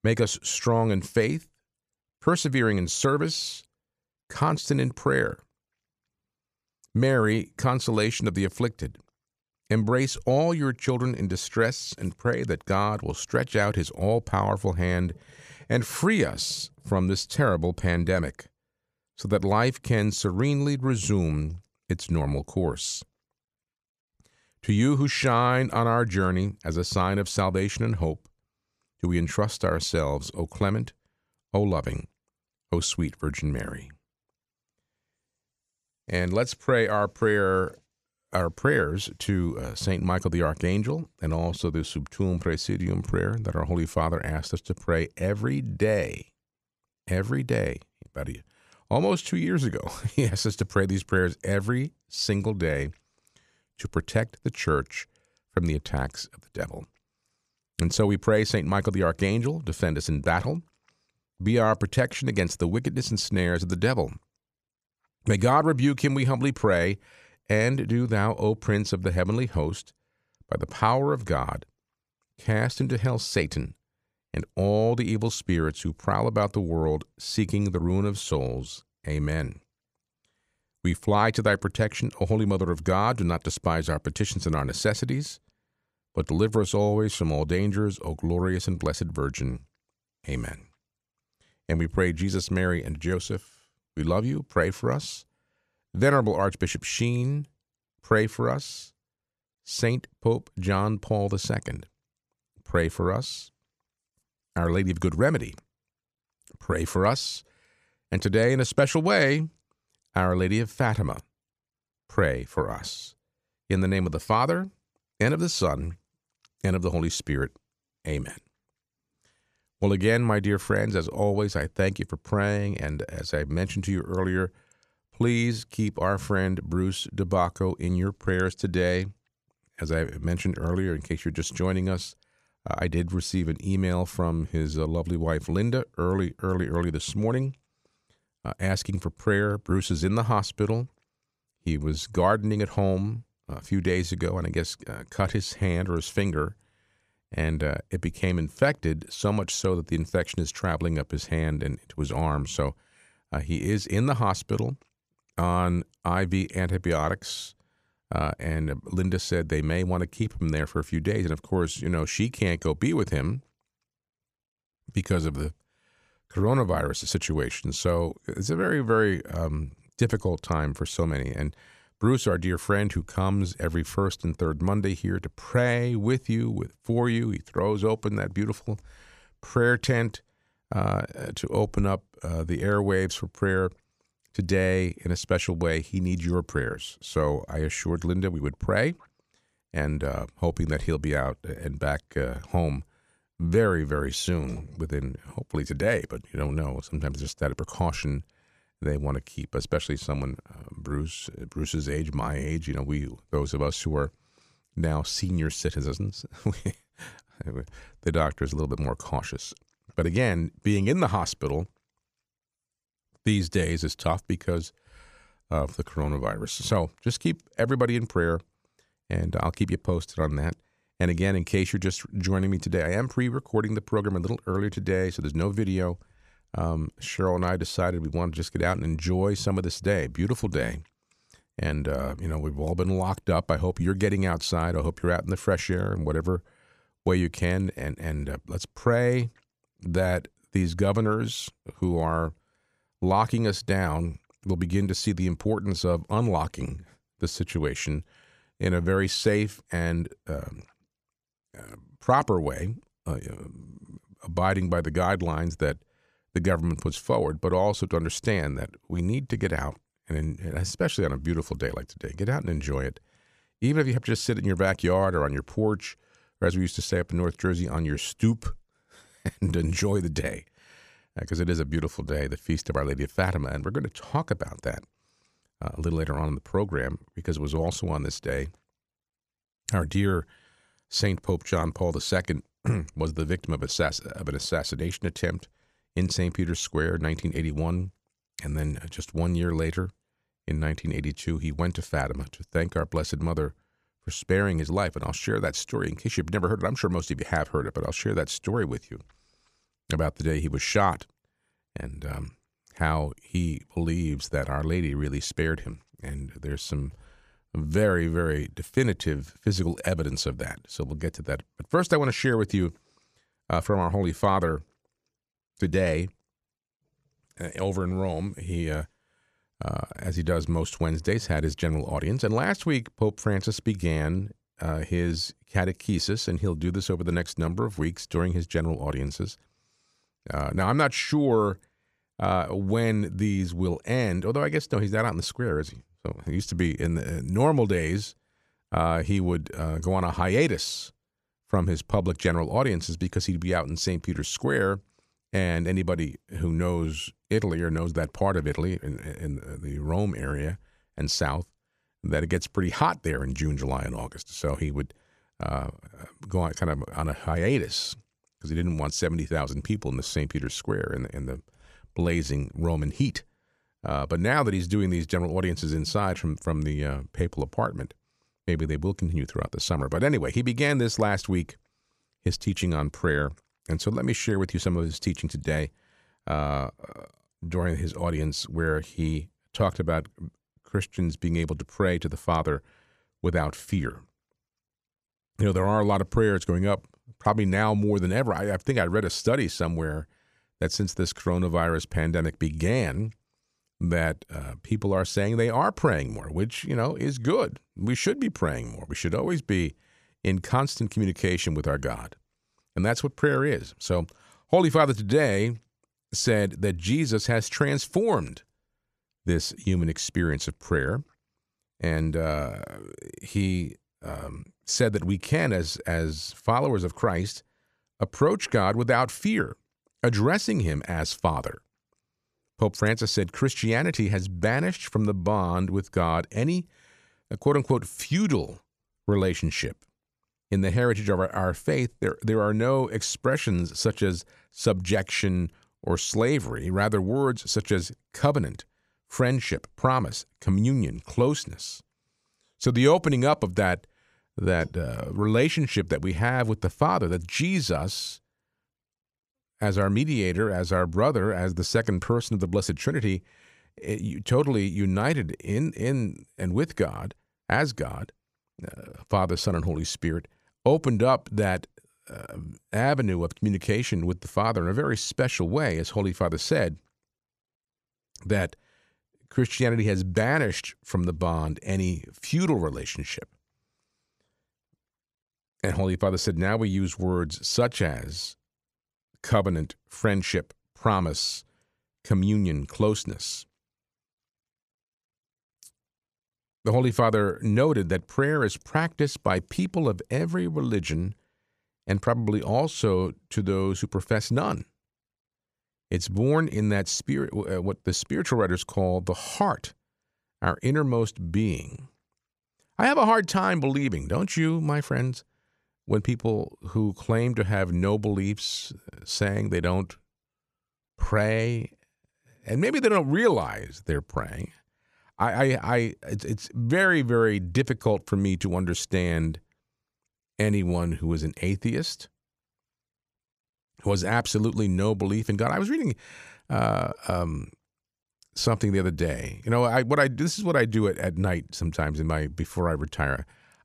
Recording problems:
none

